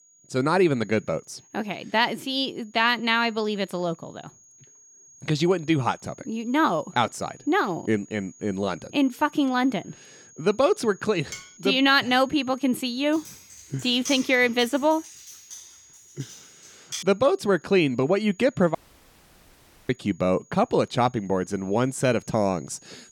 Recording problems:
high-pitched whine; faint; throughout; 6.5 kHz, 25 dB below the speech
clattering dishes; faint; at 11 s; peak 15 dB below the speech
keyboard typing; noticeable; from 13 to 17 s; peak 9 dB below the speech
audio cutting out; at 19 s for 1 s

